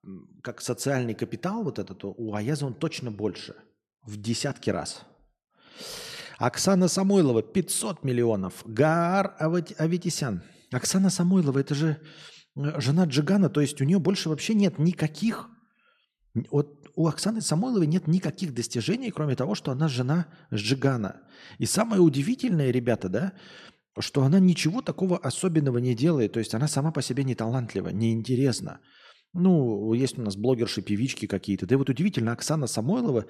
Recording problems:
none

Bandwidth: 13.5 kHz